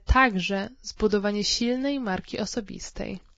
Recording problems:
garbled, watery; badly

